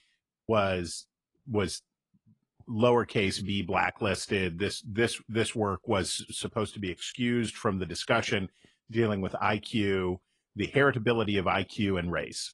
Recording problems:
garbled, watery; slightly; nothing above 10.5 kHz

